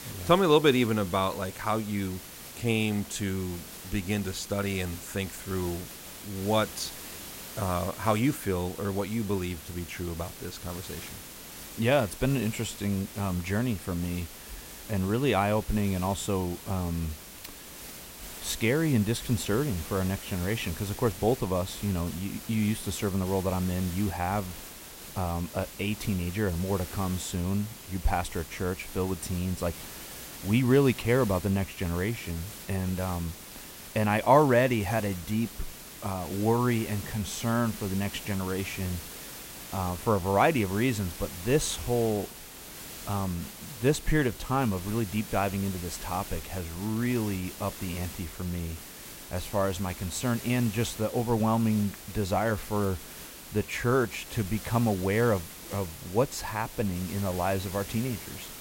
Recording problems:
hiss; noticeable; throughout; 10 dB below the speech

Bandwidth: 16 kHz